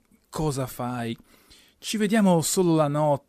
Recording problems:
none

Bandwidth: 14.5 kHz